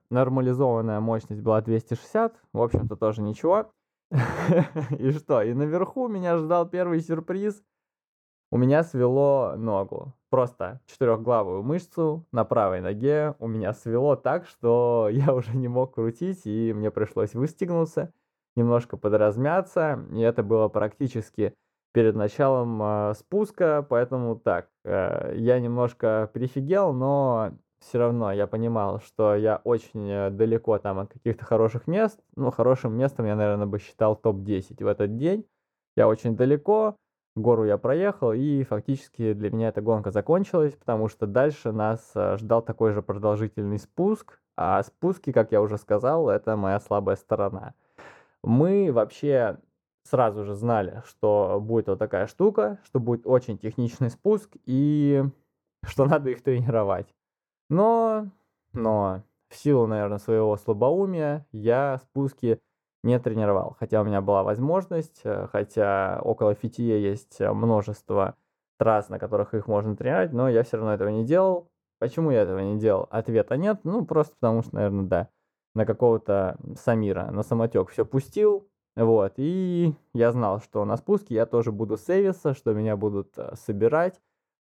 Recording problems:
muffled; very; fading above 2.5 kHz

